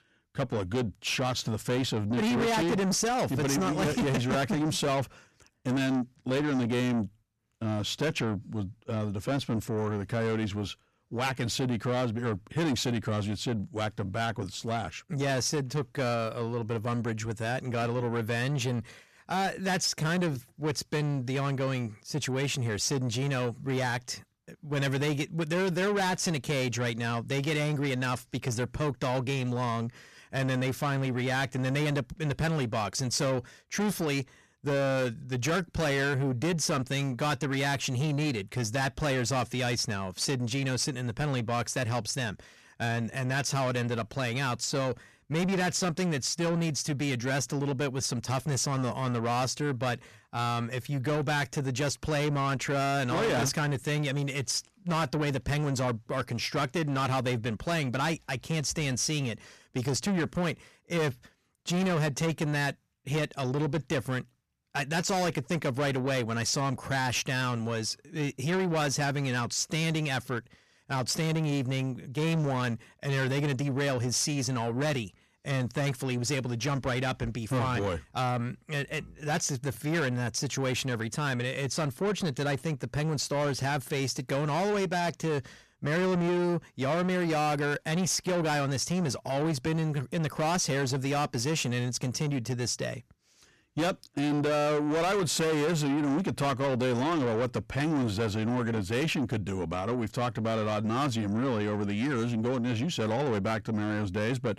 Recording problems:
distortion; heavy; 8 dB below the speech

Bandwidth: 14 kHz